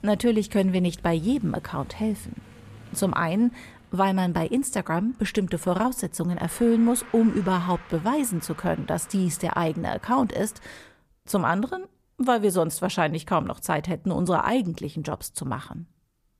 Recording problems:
traffic noise; faint; until 11 s; 20 dB below the speech

